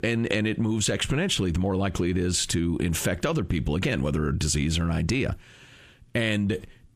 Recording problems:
squashed, flat; heavily

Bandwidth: 15 kHz